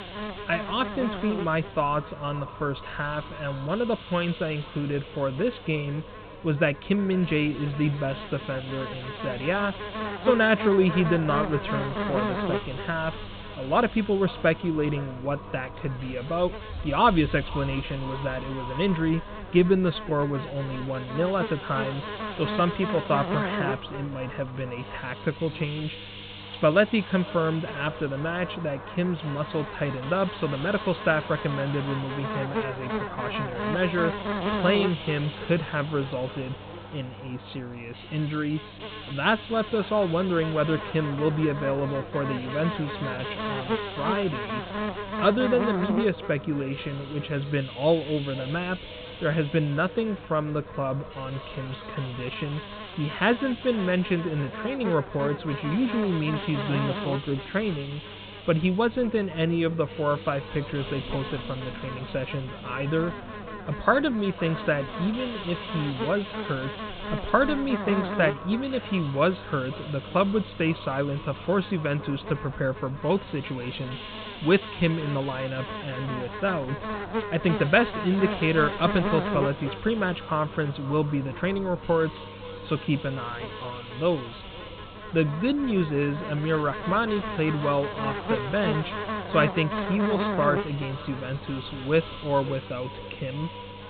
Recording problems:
high frequencies cut off; severe; nothing above 4 kHz
echo of what is said; noticeable; throughout; 510 ms later, 20 dB below the speech
electrical hum; loud; throughout; 50 Hz, 7 dB below the speech
hiss; noticeable; throughout; 15 dB below the speech
wind in the background; faint; throughout; 20 dB below the speech

